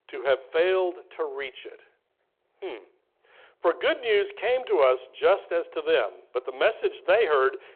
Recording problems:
phone-call audio

